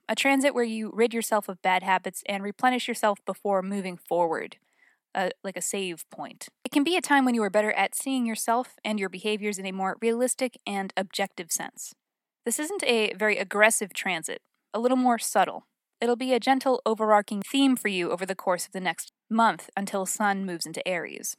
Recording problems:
none

